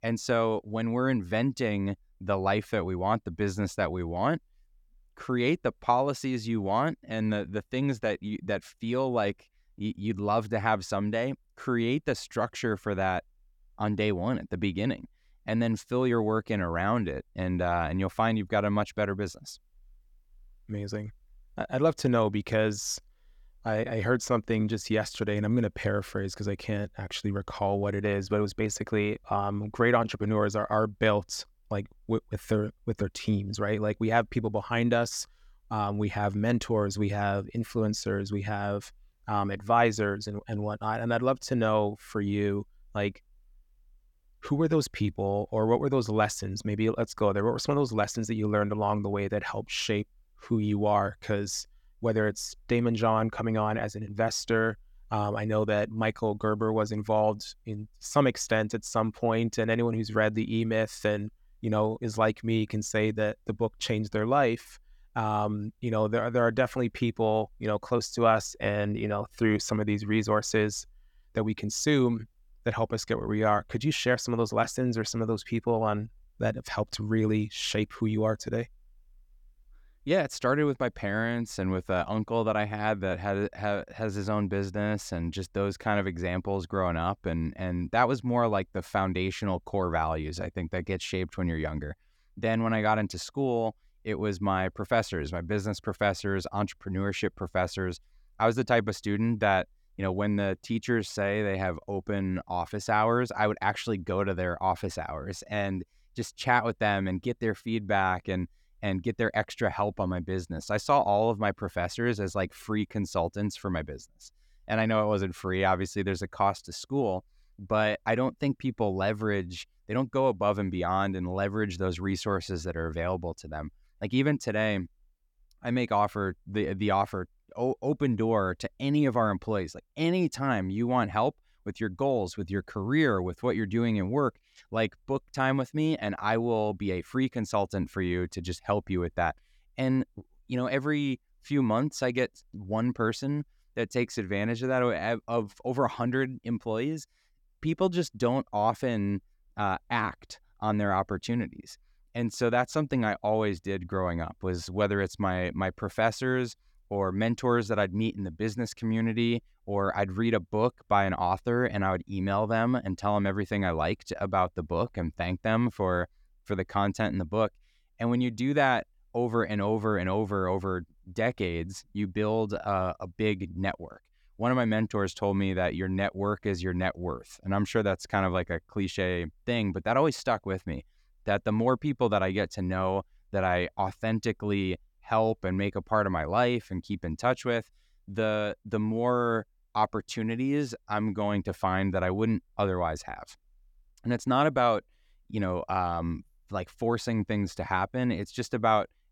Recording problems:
none

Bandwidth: 18.5 kHz